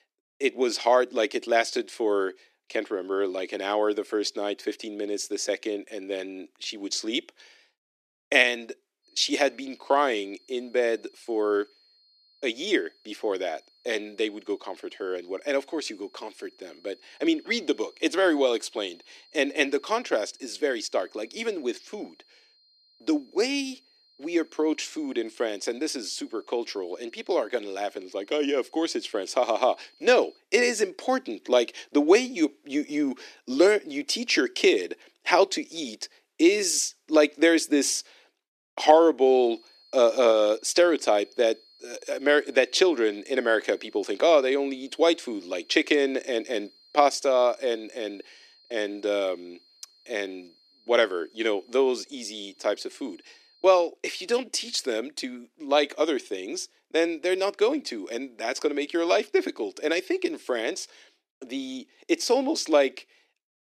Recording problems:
thin; somewhat; fading below 300 Hz
high-pitched whine; faint; from 9 to 30 s and from 39 to 54 s; 4.5 kHz, 30 dB below the speech

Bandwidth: 14 kHz